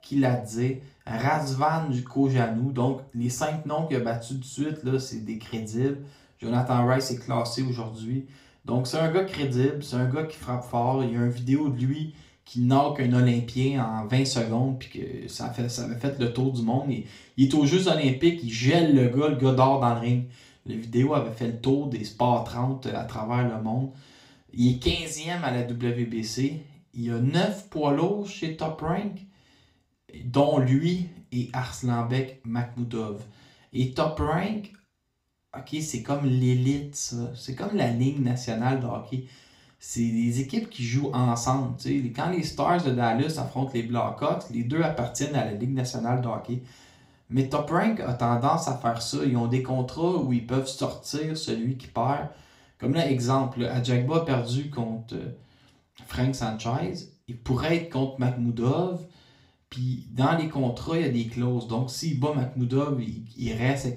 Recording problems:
off-mic speech; far
room echo; slight; dies away in 0.4 s

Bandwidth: 15.5 kHz